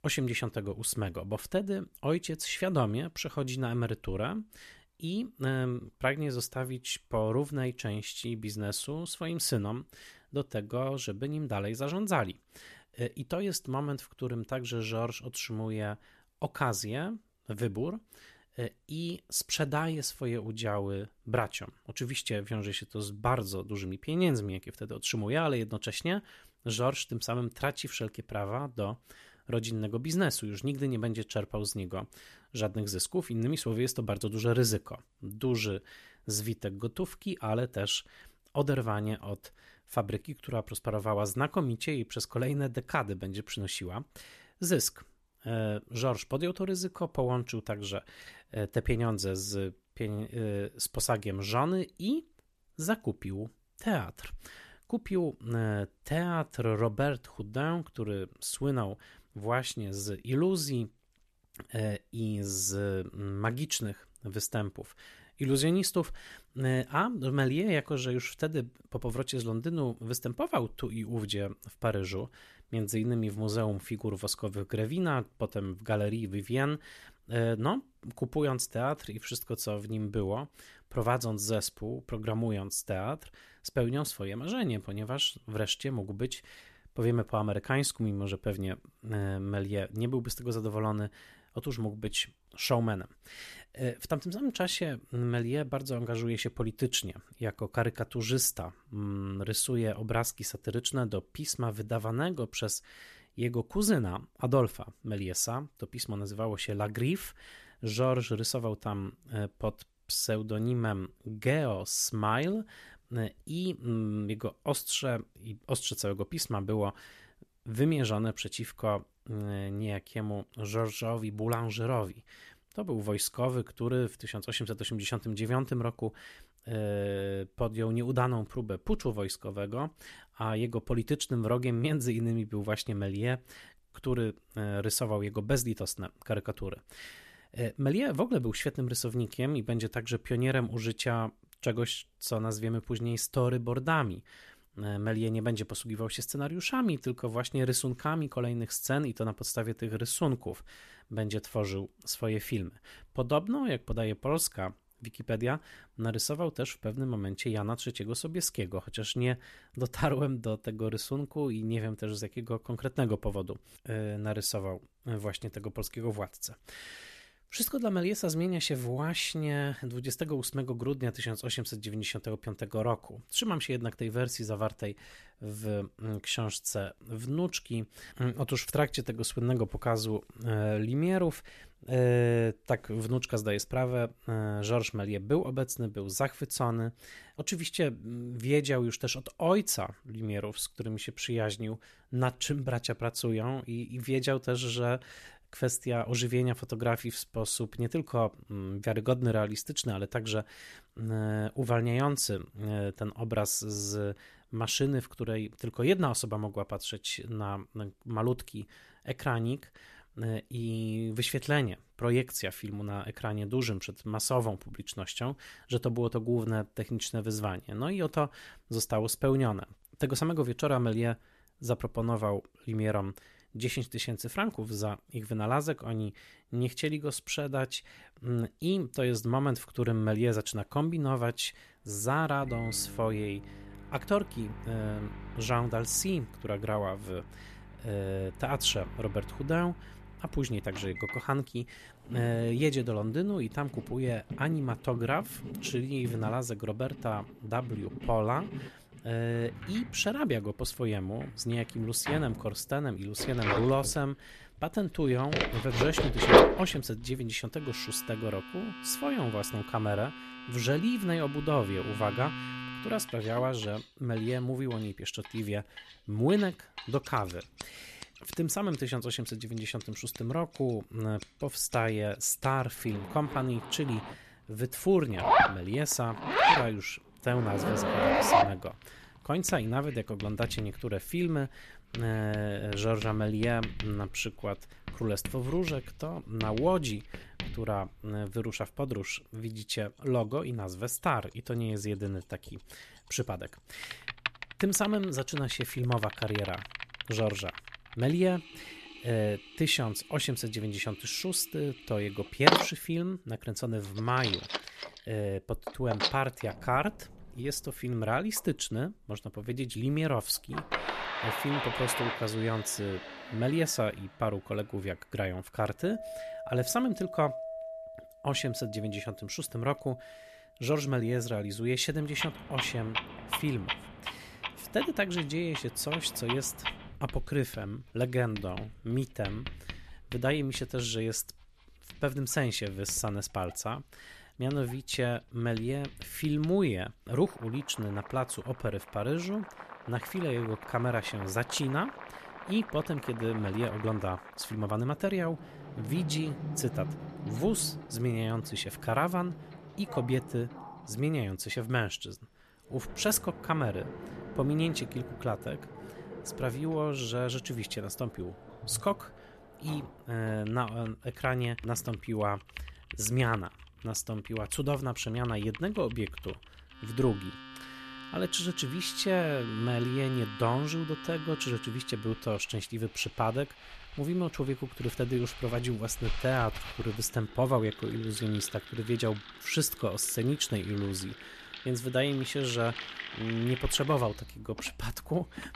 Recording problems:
household noises; loud; from 3:50 on; 4 dB below the speech

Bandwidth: 14 kHz